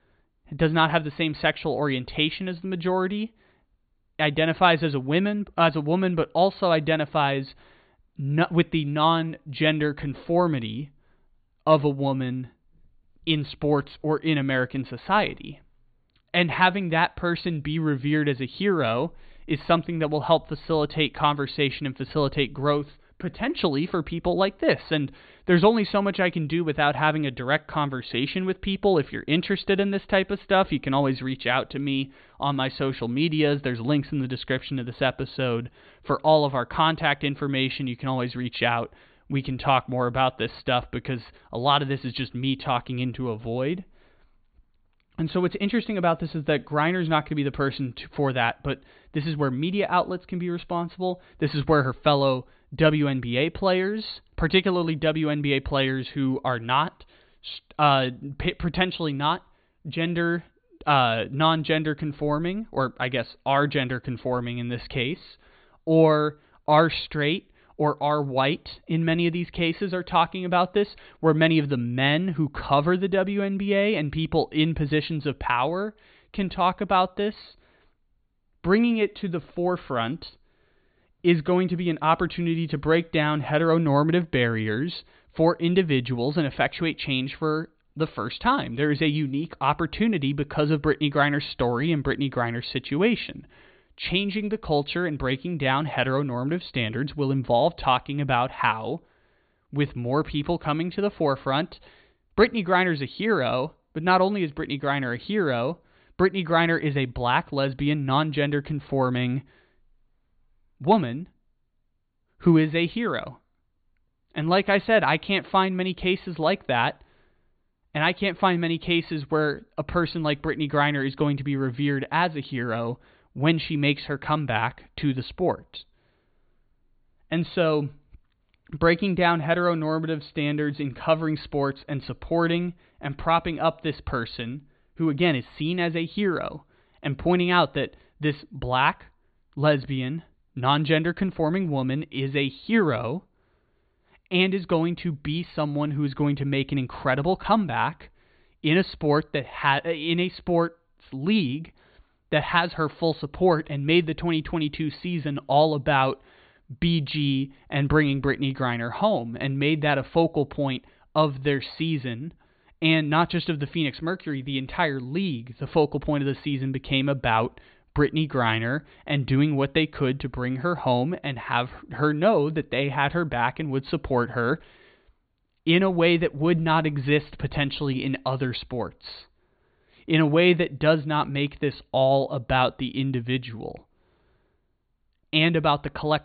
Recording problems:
high frequencies cut off; severe; nothing above 4.5 kHz

